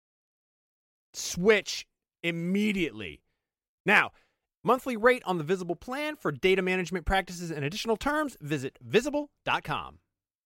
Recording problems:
none

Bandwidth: 16 kHz